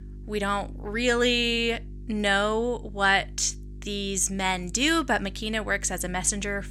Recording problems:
electrical hum; faint; throughout; 50 Hz, 30 dB below the speech

